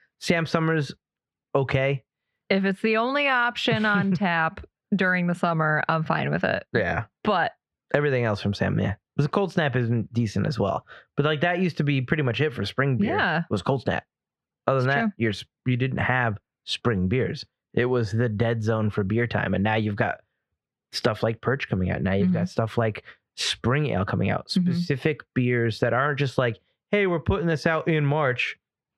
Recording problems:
muffled; slightly; fading above 2 kHz
squashed, flat; somewhat

